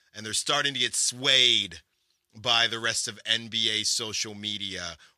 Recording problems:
thin; somewhat; fading below 500 Hz

